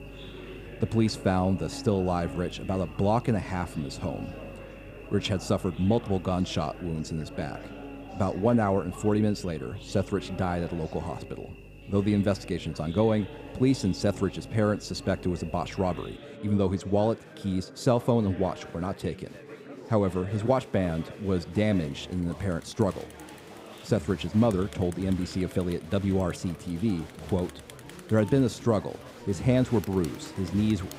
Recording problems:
electrical hum; noticeable; until 16 s; 50 Hz, 20 dB below the speech
chatter from many people; noticeable; throughout; 15 dB below the speech

